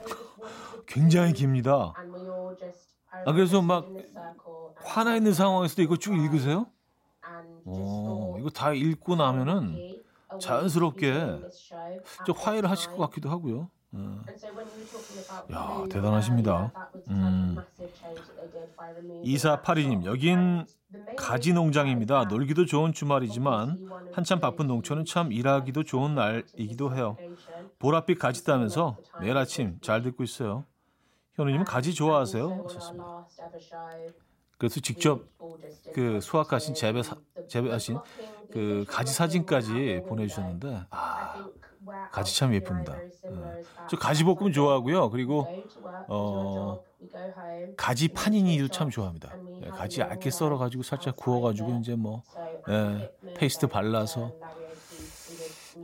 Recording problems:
voice in the background; noticeable; throughout; 15 dB below the speech

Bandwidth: 16 kHz